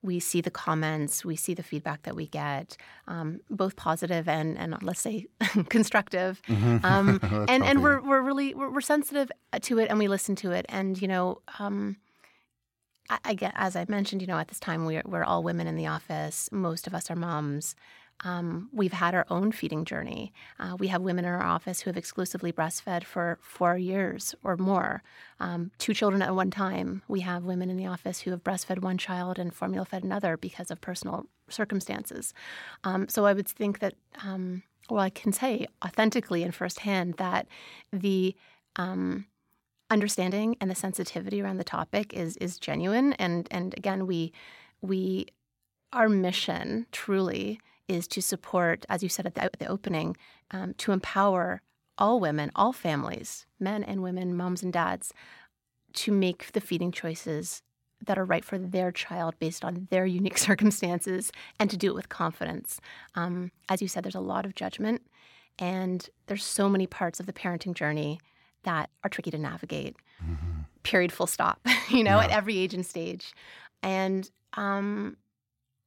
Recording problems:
uneven, jittery; strongly; from 13 s to 1:15

